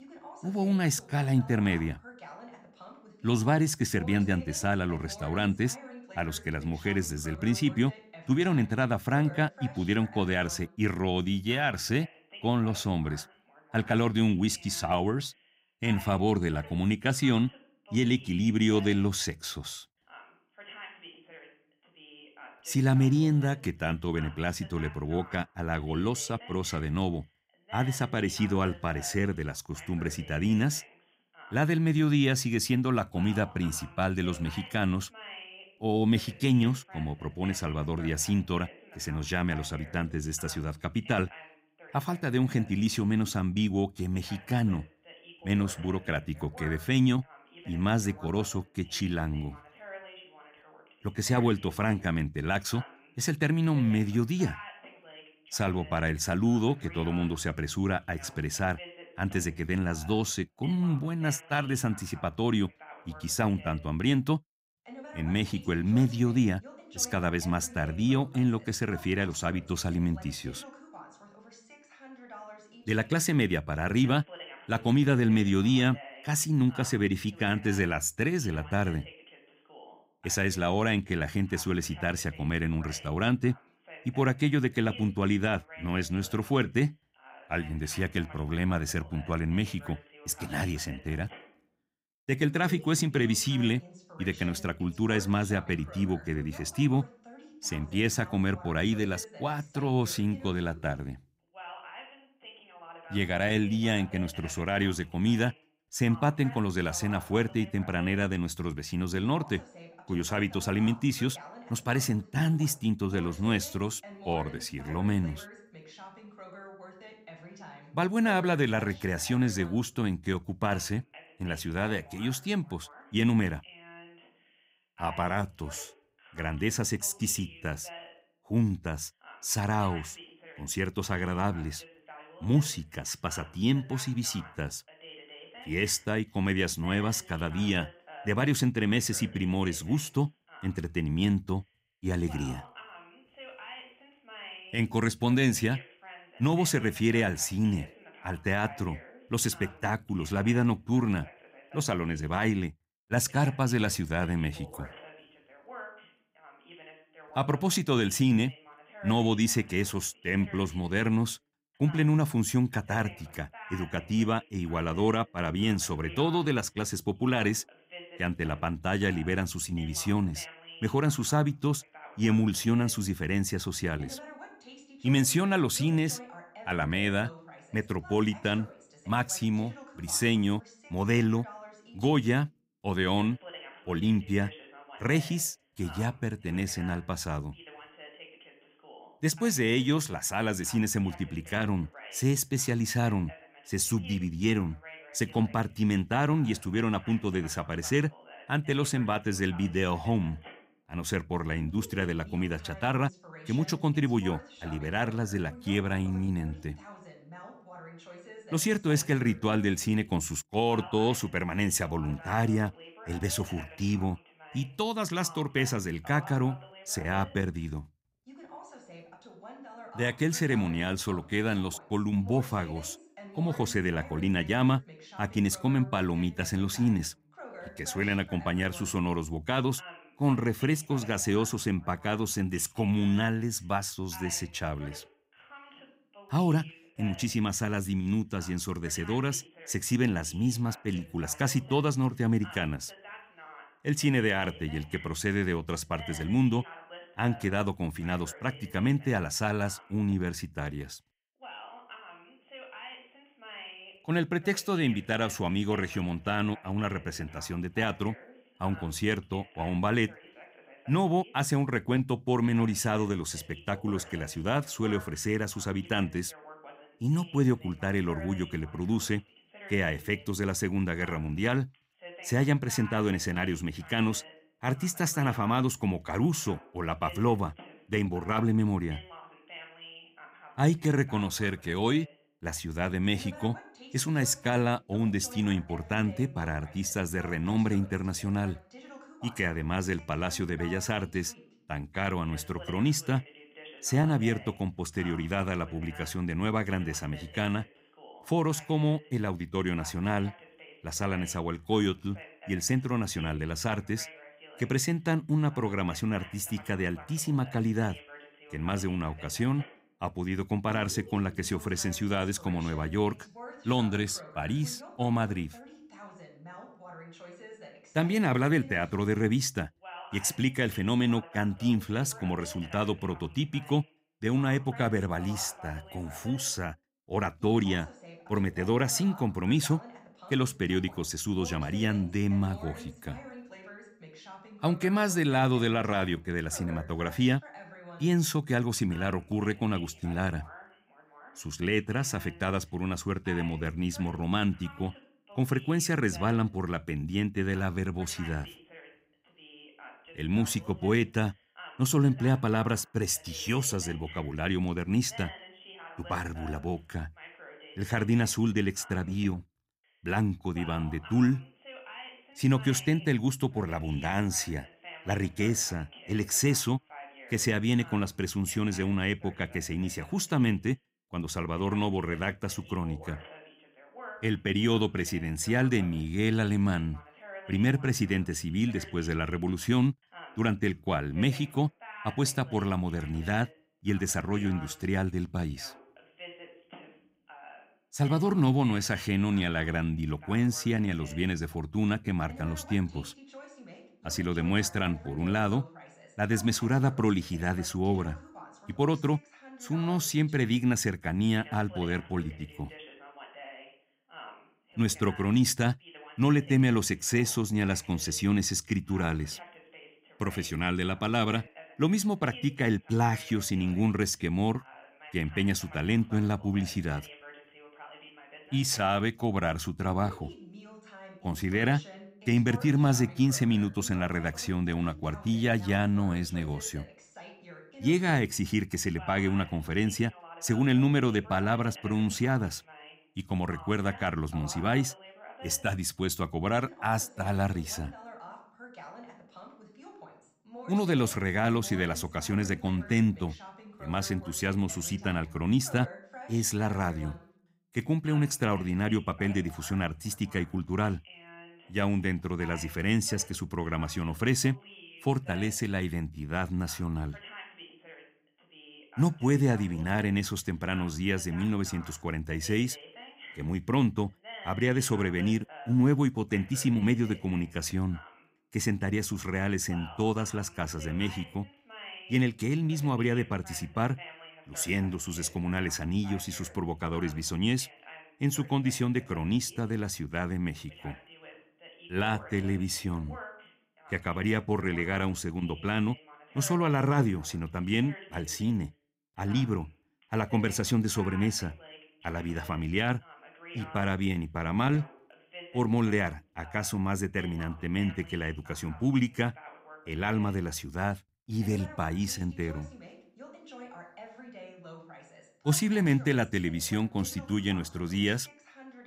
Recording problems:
voice in the background; noticeable; throughout; 20 dB below the speech

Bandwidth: 15.5 kHz